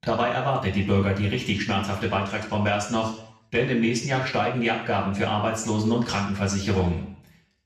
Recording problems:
off-mic speech; far
room echo; noticeable; dies away in 0.6 s

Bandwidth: 14.5 kHz